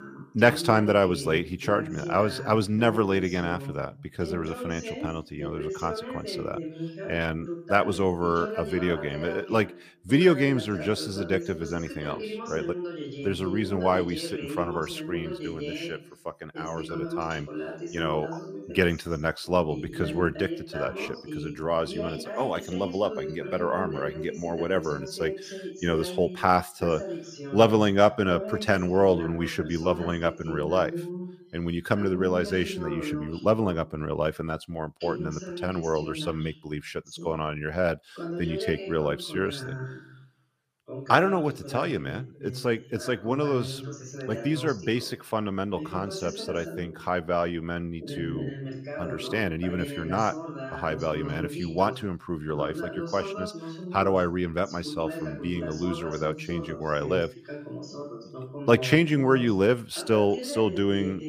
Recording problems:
voice in the background; loud; throughout; 9 dB below the speech

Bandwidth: 15 kHz